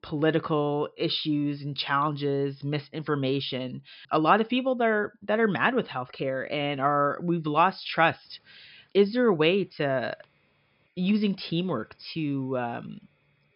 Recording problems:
high frequencies cut off; noticeable; nothing above 5.5 kHz

